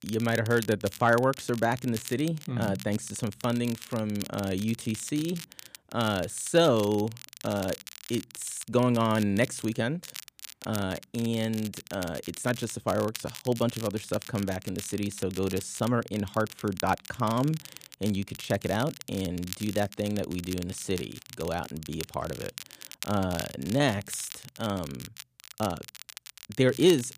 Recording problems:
crackle, like an old record; noticeable; 15 dB below the speech

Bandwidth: 15 kHz